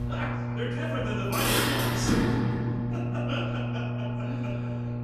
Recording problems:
off-mic speech; far
echo of what is said; noticeable; throughout; 300 ms later, 15 dB below the speech
room echo; noticeable; dies away in 1.1 s
traffic noise; very loud; throughout; 6 dB above the speech
electrical hum; loud; throughout; 60 Hz, 6 dB below the speech
background chatter; faint; throughout; 2 voices, 25 dB below the speech

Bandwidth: 14.5 kHz